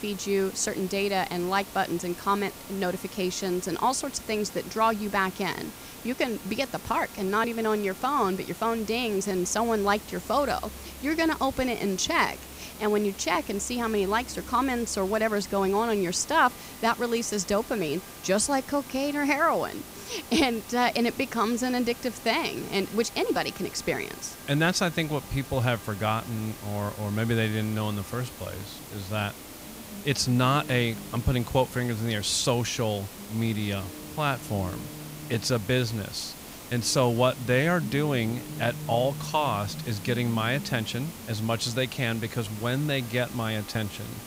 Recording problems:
background music; noticeable; throughout; 20 dB below the speech
hiss; noticeable; throughout; 15 dB below the speech

